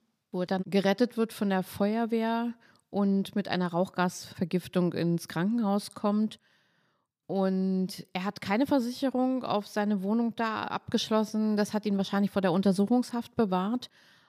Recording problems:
none

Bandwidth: 15 kHz